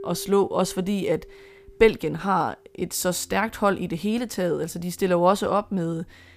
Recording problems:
background music; faint; throughout; 25 dB below the speech

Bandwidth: 15 kHz